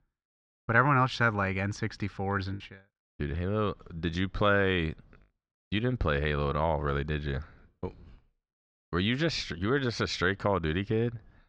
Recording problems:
muffled; very slightly; fading above 4 kHz
choppy; occasionally; at 2.5 s; 2% of the speech affected

